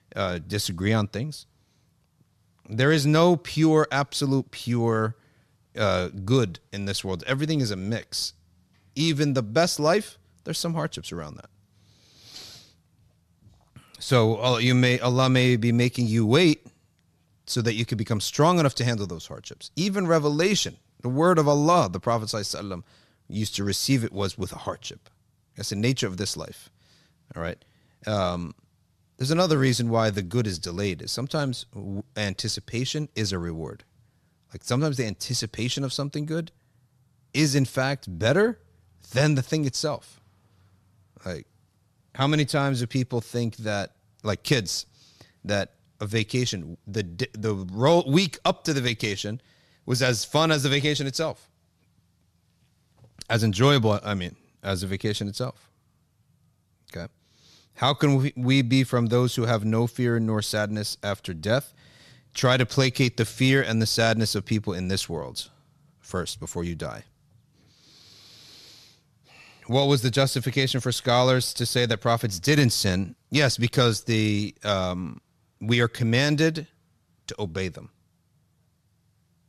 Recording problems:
none

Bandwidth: 13.5 kHz